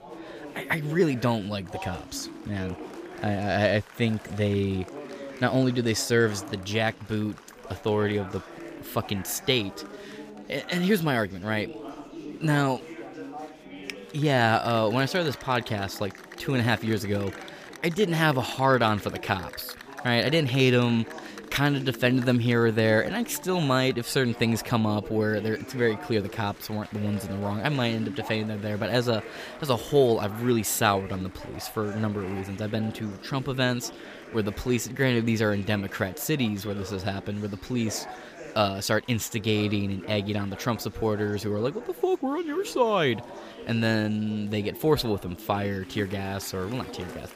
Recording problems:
chatter from many people; noticeable; throughout; 15 dB below the speech

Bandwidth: 15 kHz